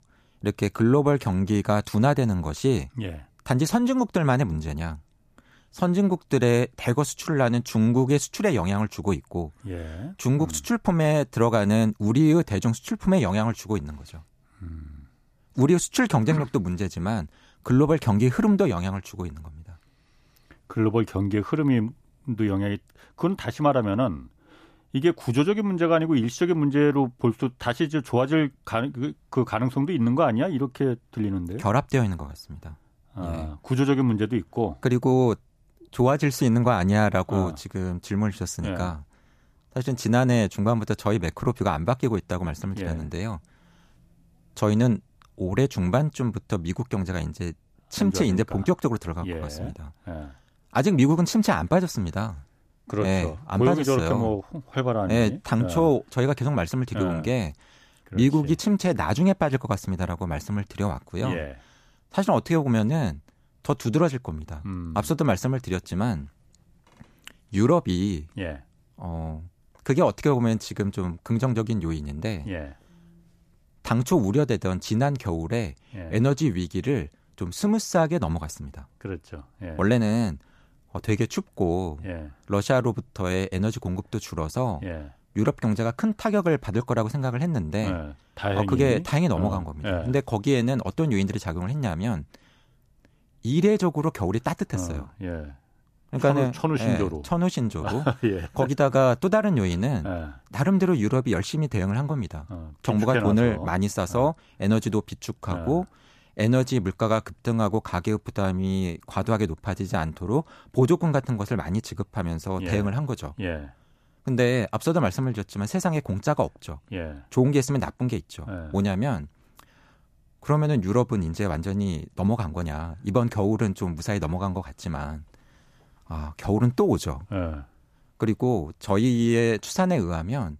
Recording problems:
none

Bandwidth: 14.5 kHz